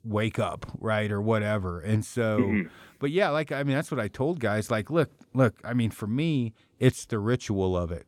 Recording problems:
none

